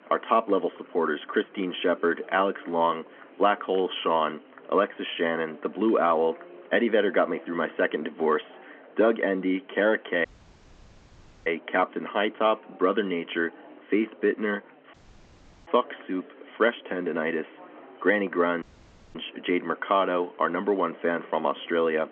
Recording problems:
phone-call audio; nothing above 3.5 kHz
murmuring crowd; faint; throughout; 25 dB below the speech
audio cutting out; at 10 s for 1 s, at 15 s for 0.5 s and at 19 s for 0.5 s

